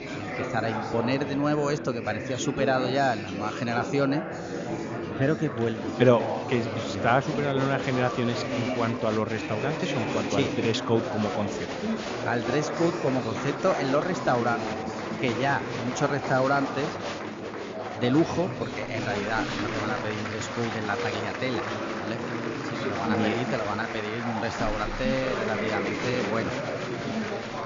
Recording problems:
high frequencies cut off; noticeable; nothing above 7 kHz
chatter from many people; loud; throughout; 3 dB below the speech

